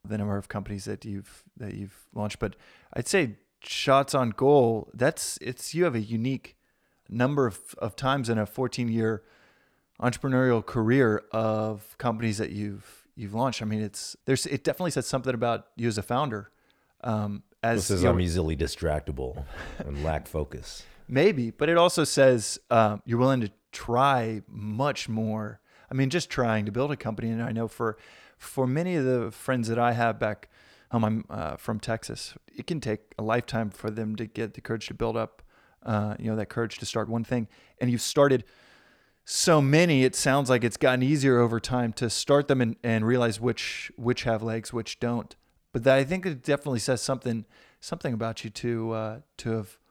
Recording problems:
uneven, jittery; strongly; from 5.5 to 46 s

